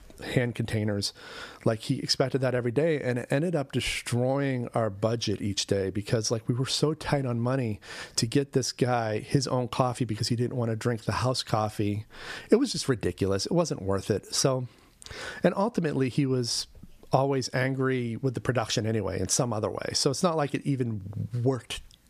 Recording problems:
squashed, flat; somewhat

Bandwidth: 14.5 kHz